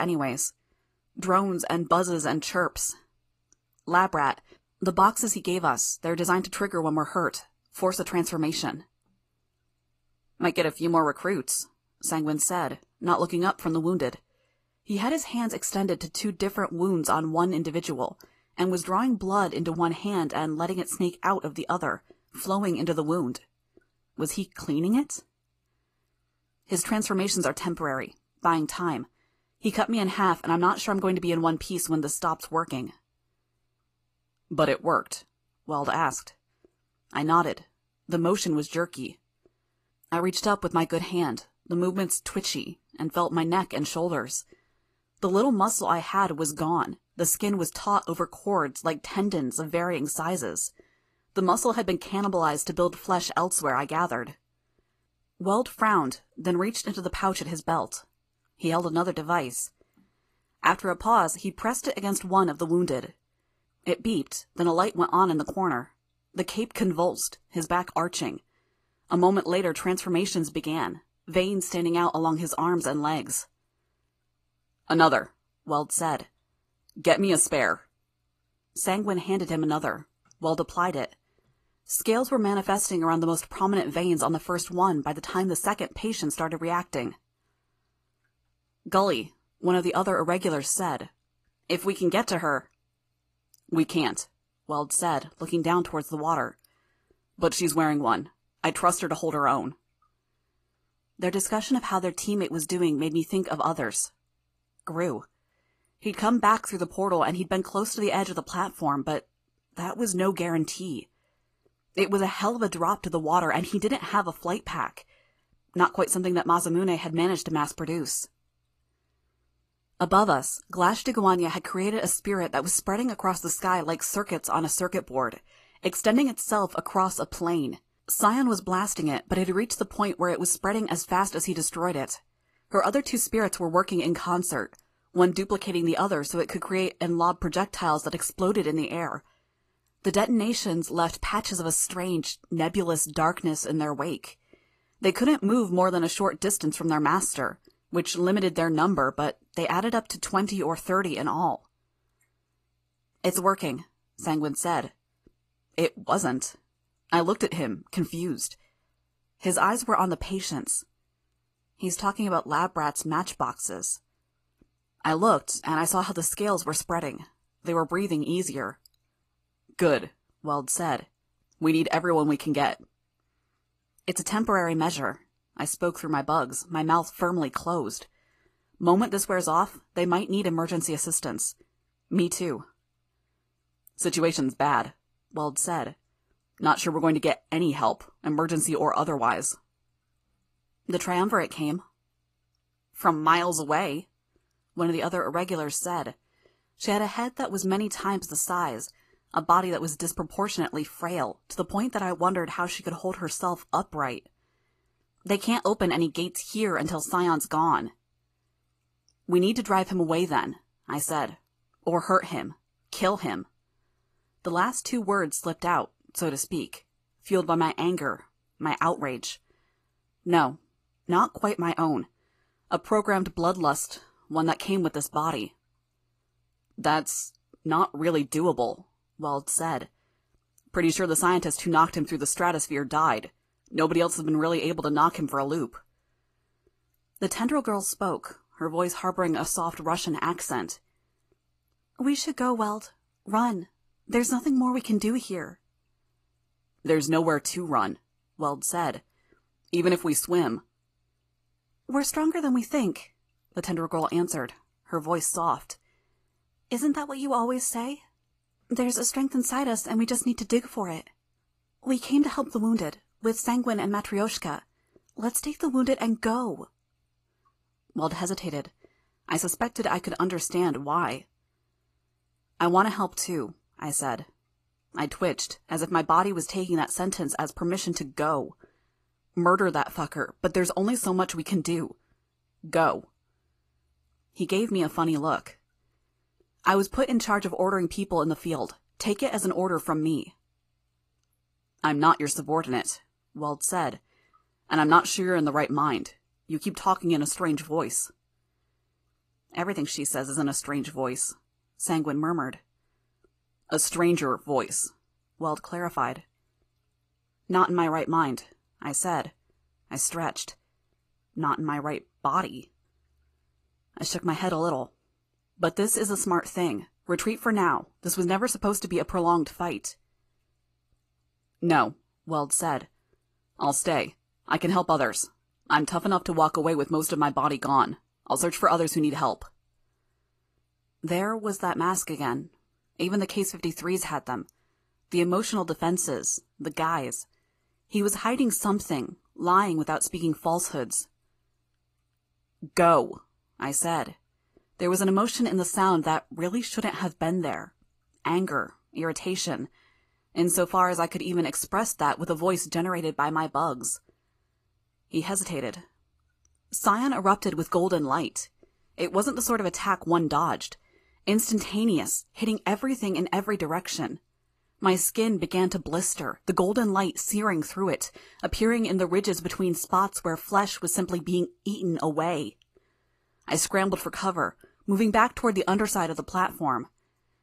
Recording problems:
garbled, watery; slightly; nothing above 15 kHz
abrupt cut into speech; at the start

